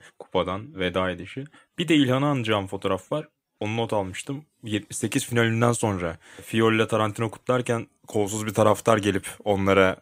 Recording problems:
none

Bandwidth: 15.5 kHz